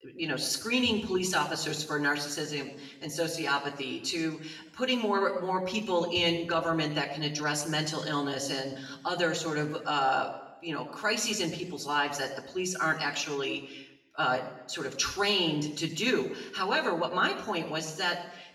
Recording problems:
off-mic speech; far
room echo; slight; dies away in 0.8 s

